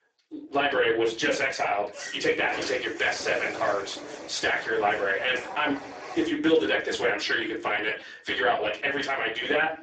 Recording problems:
off-mic speech; far
garbled, watery; badly; nothing above 7.5 kHz
thin; somewhat; fading below 300 Hz
room echo; slight; dies away in 0.4 s
door banging; noticeable; from 2 to 6.5 s; peak 8 dB below the speech

